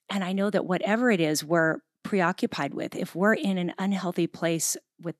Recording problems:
none

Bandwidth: 13.5 kHz